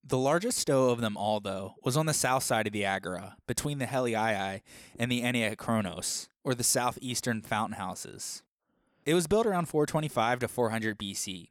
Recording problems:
none

